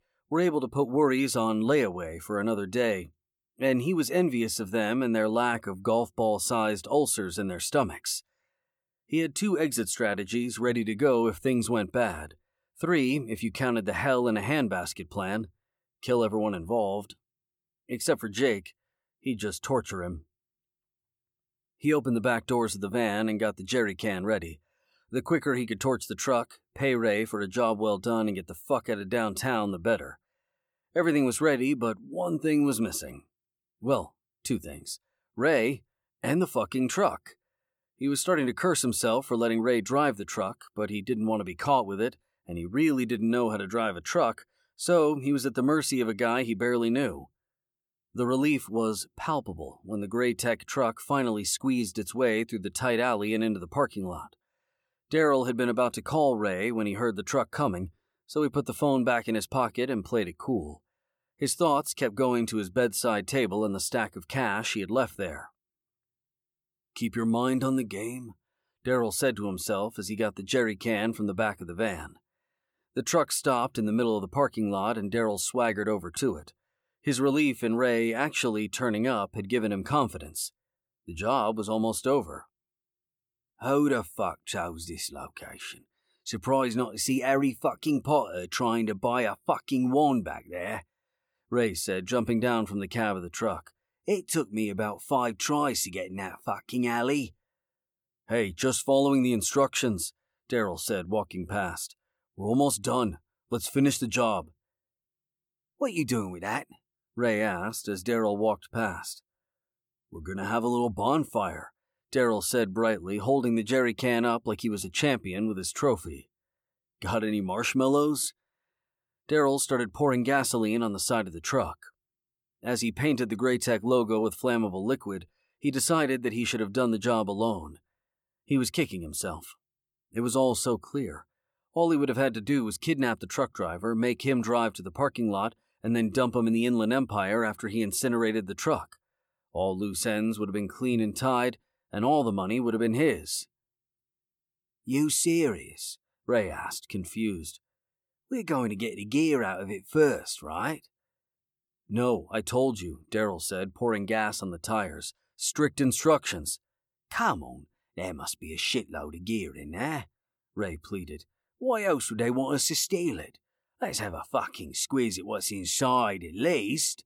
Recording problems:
none

